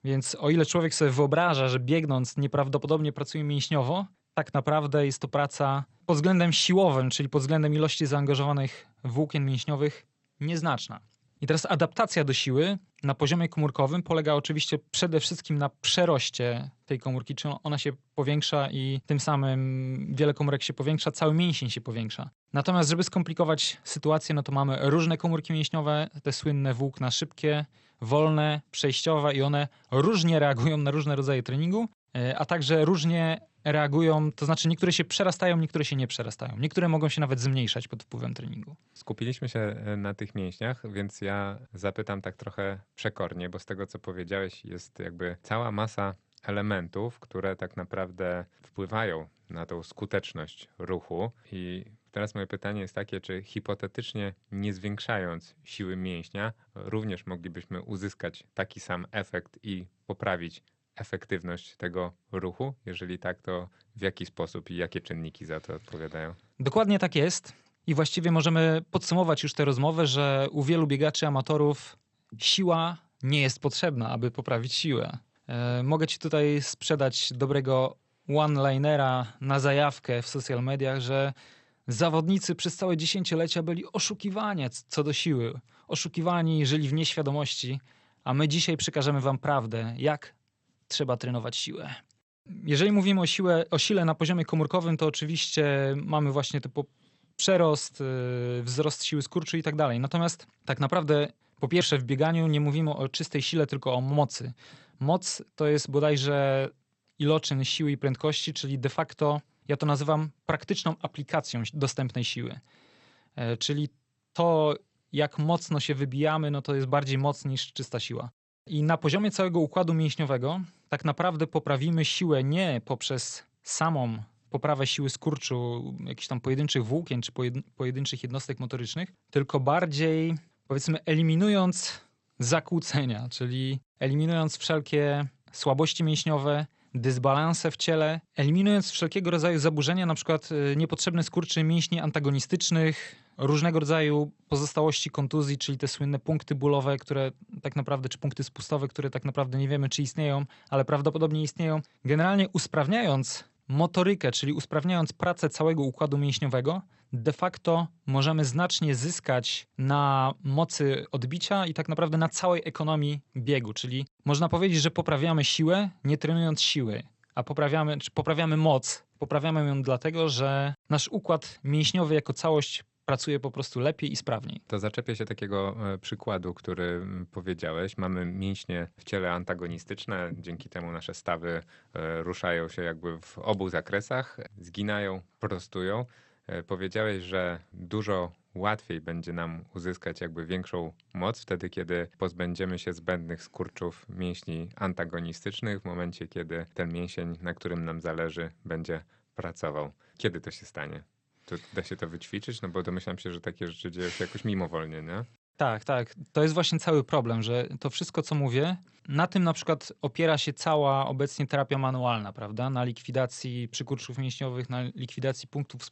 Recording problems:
garbled, watery; slightly; nothing above 8.5 kHz

